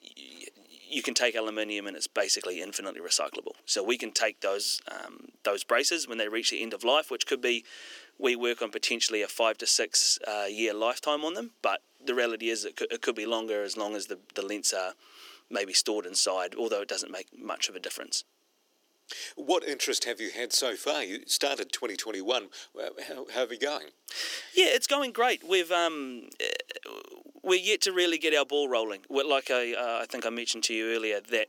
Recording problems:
thin; somewhat; fading below 350 Hz

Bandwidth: 17 kHz